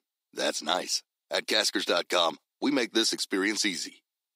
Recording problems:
thin; somewhat; fading below 300 Hz

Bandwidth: 15.5 kHz